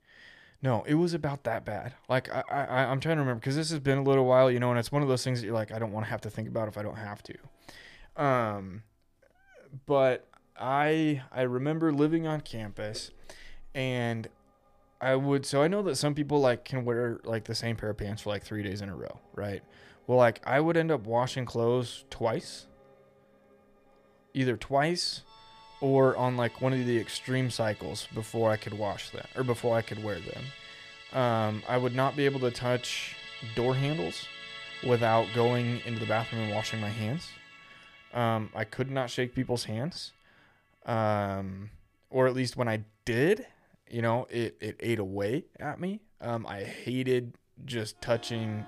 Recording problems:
background music; noticeable; throughout; 15 dB below the speech

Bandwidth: 15 kHz